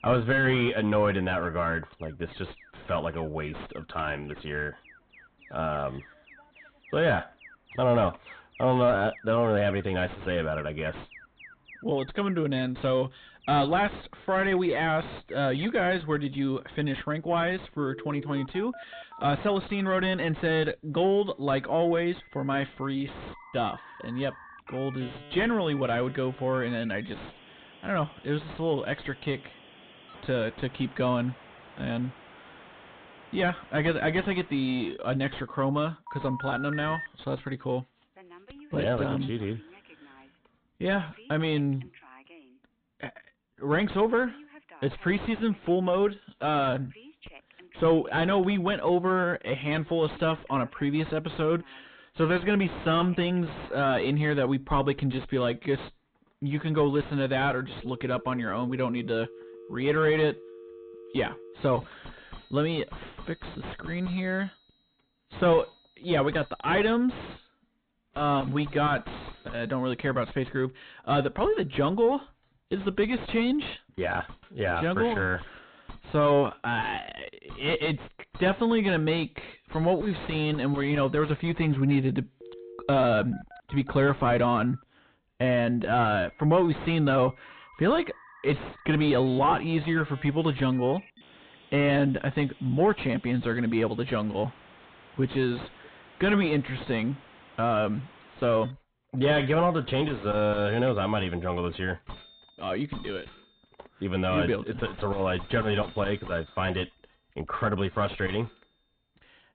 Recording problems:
distortion; heavy; 5 dB below the speech
high frequencies cut off; severe; nothing above 4 kHz
alarms or sirens; noticeable; throughout; 20 dB below the speech

